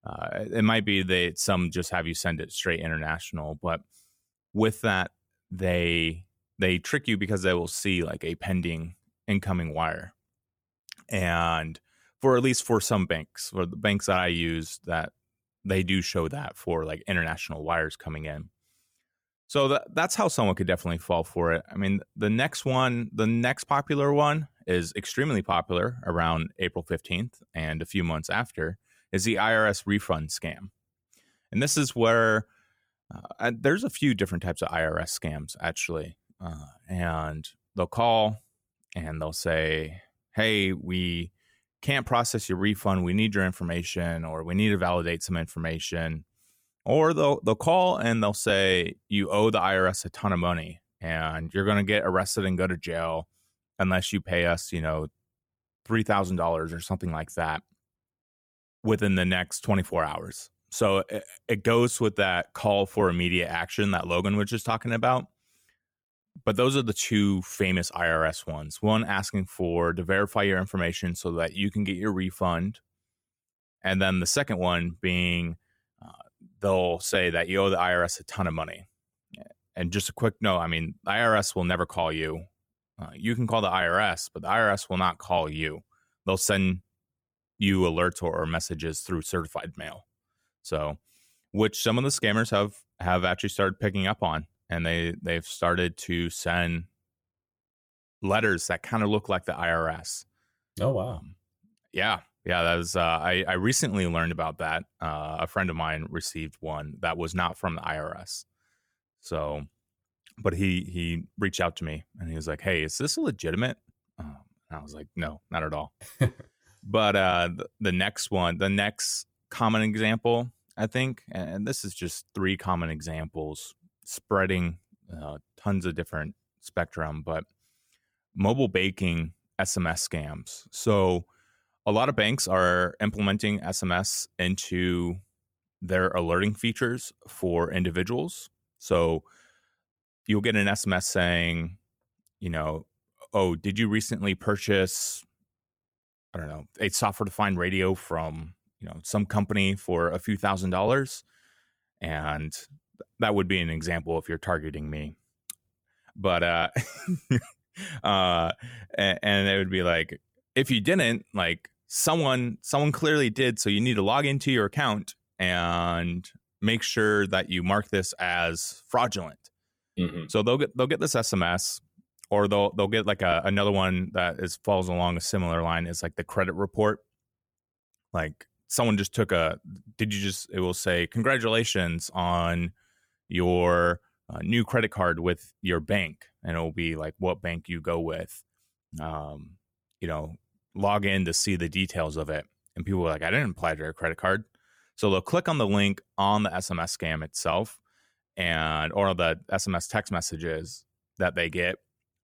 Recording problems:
none

